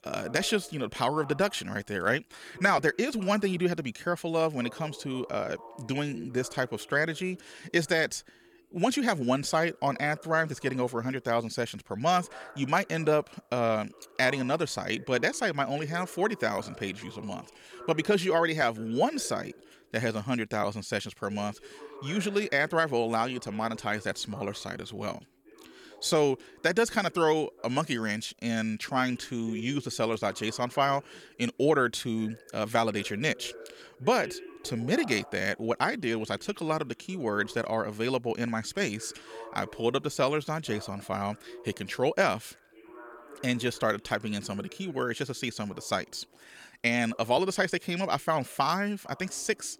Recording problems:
voice in the background; faint; throughout; 20 dB below the speech

